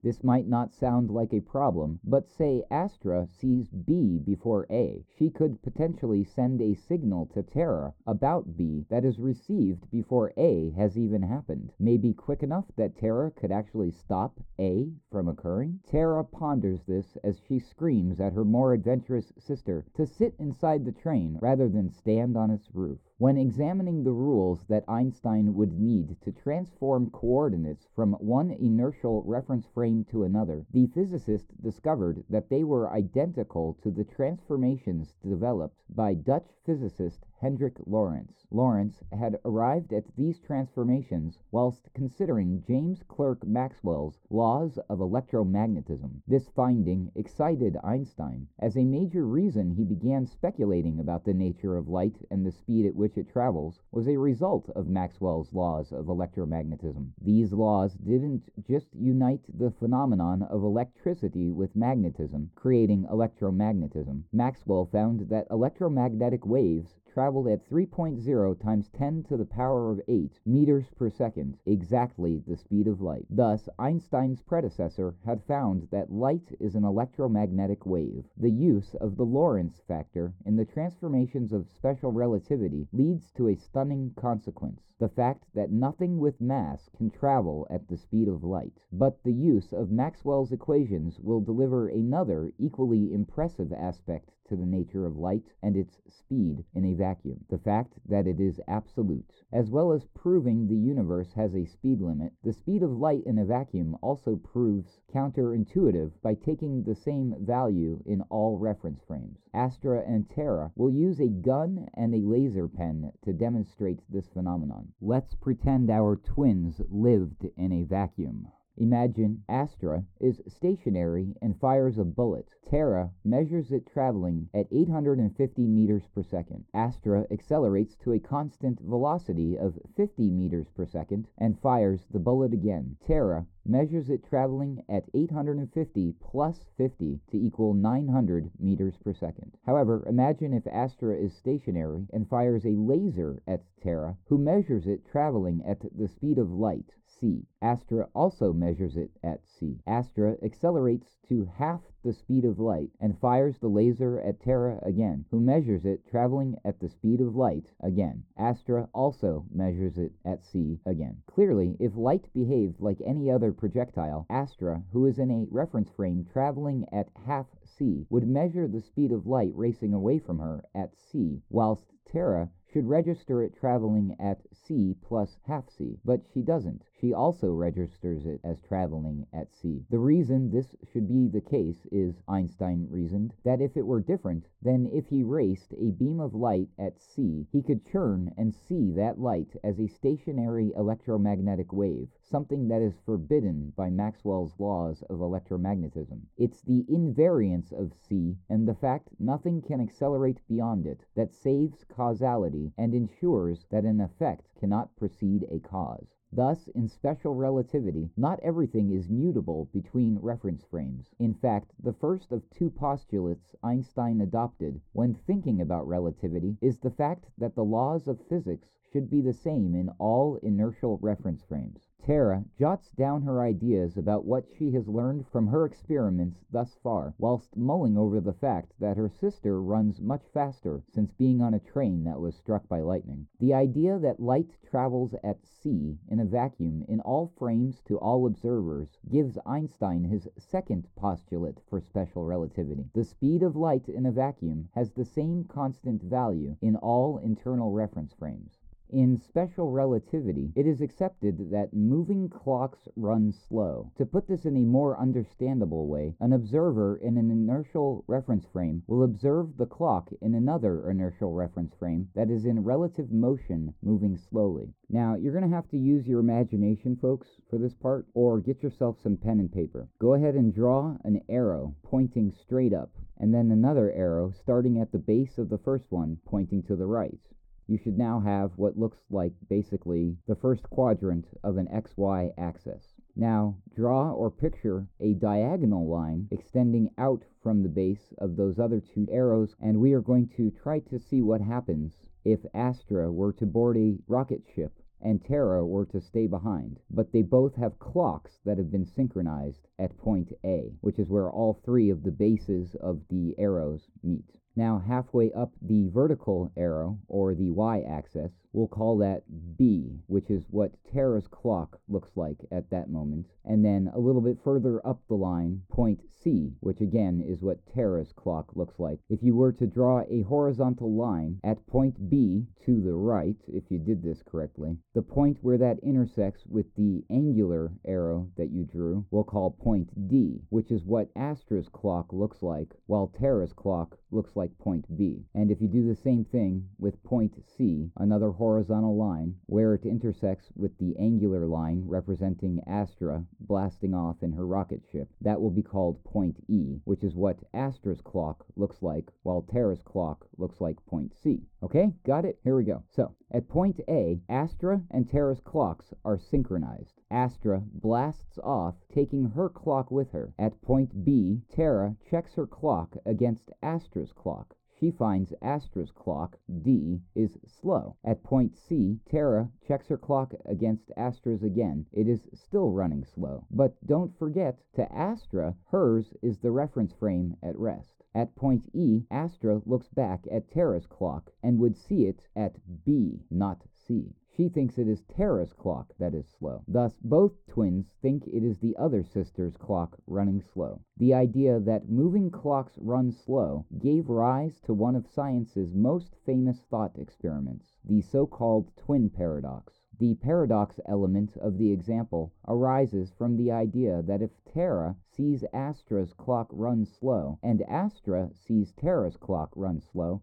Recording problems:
muffled; very; fading above 1.5 kHz

